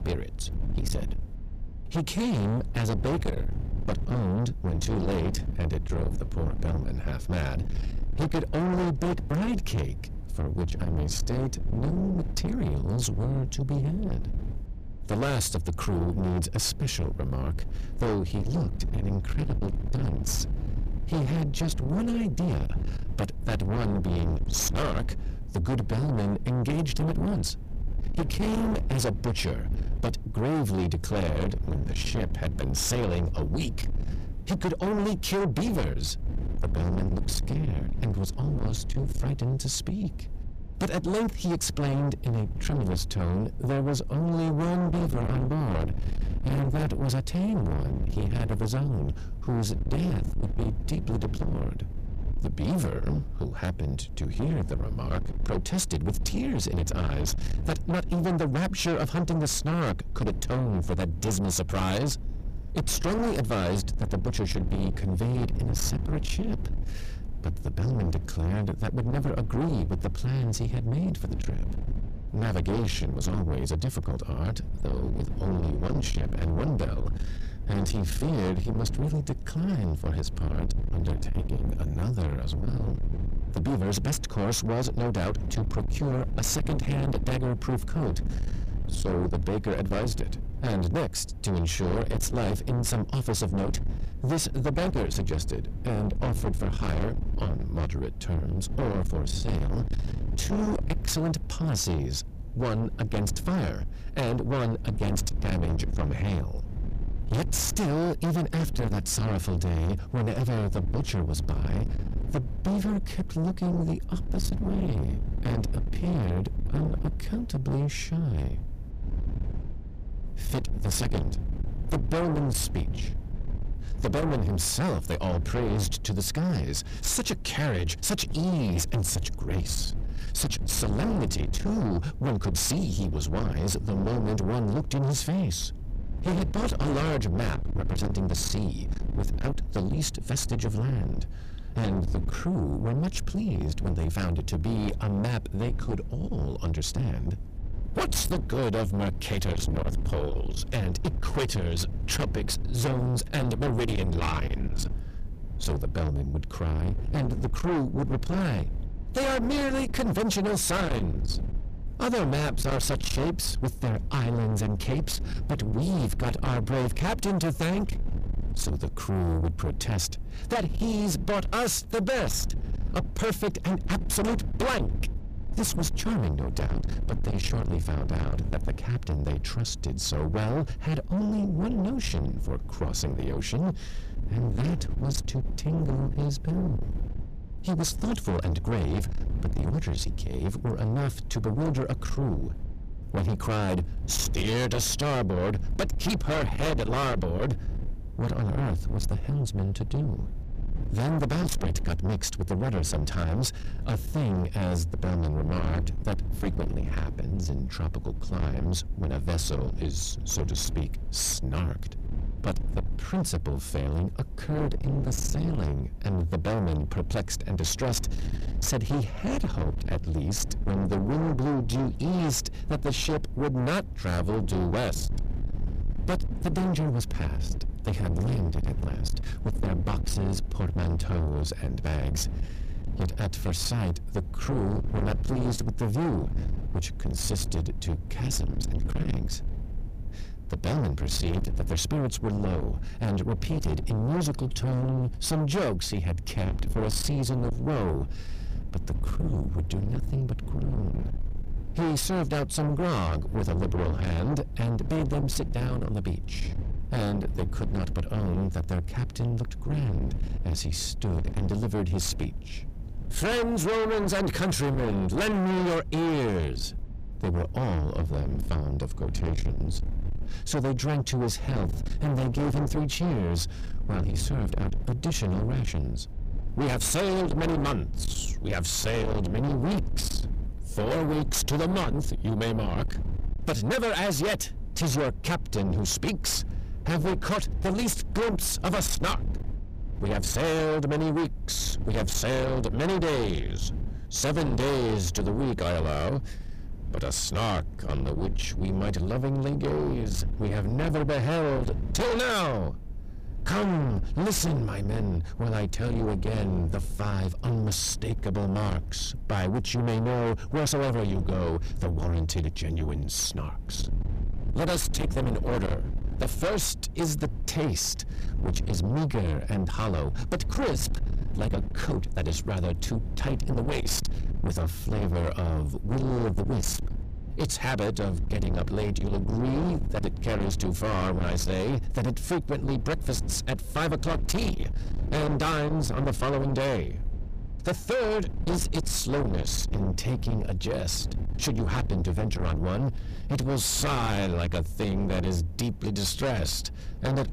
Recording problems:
distortion; heavy; 6 dB below the speech
low rumble; noticeable; throughout; 10 dB below the speech

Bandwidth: 15 kHz